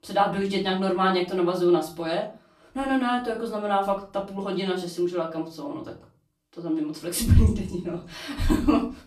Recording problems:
off-mic speech; far
room echo; slight; dies away in 0.3 s

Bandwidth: 14.5 kHz